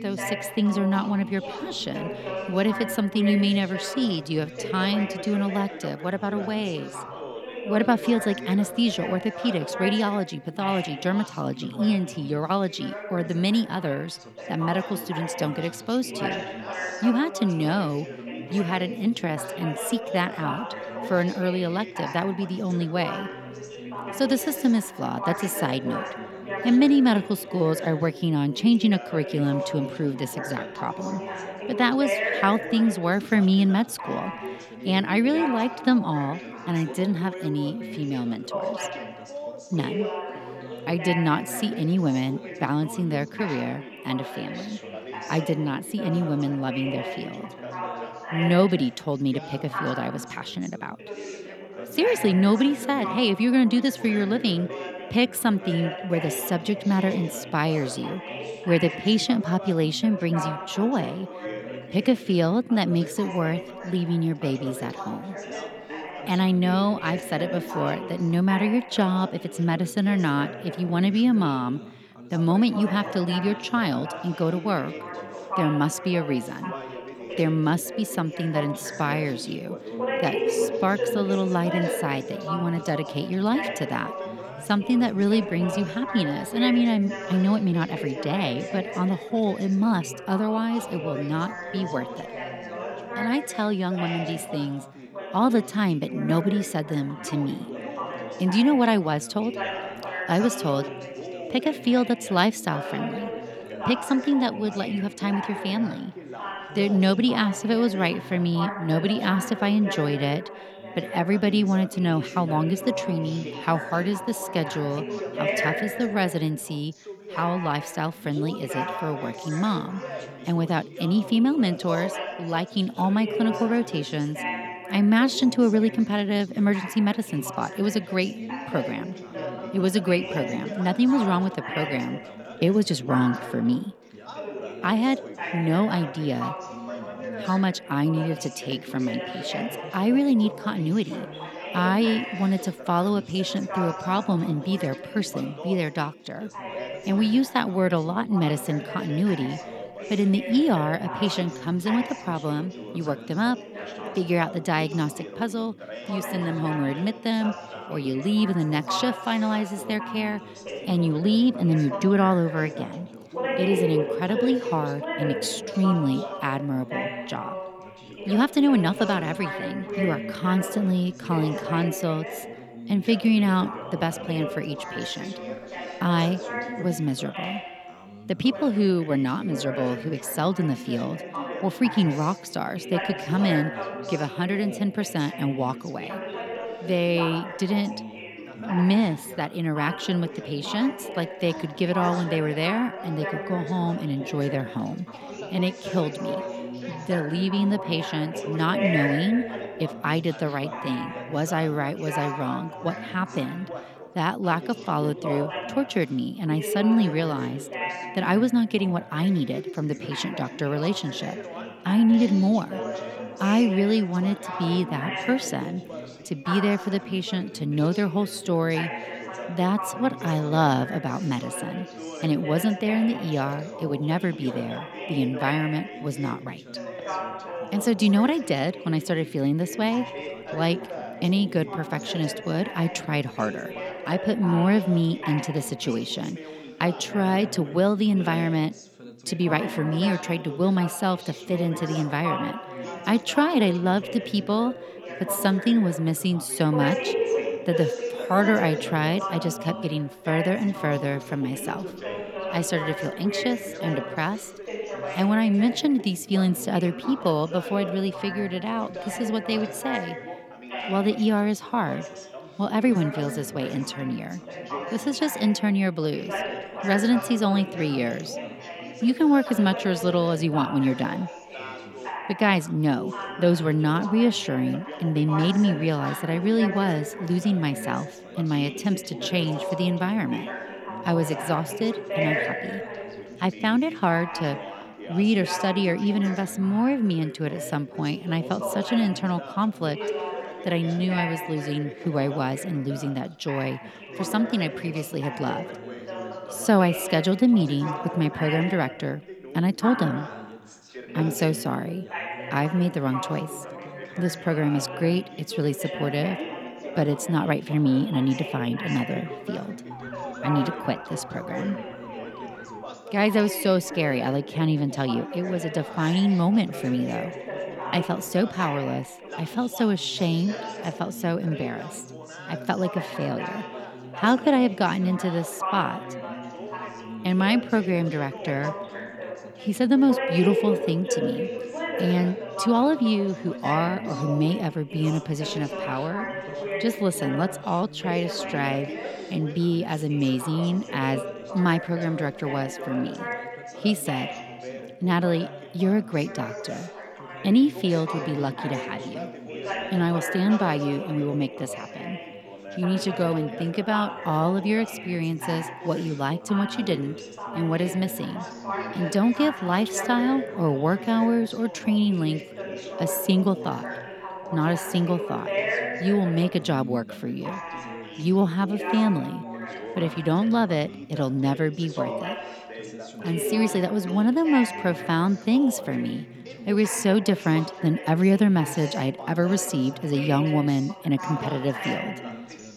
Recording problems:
background chatter; loud; throughout; 3 voices, 9 dB below the speech
siren; faint; from 5:10 to 5:13; peak 15 dB below the speech

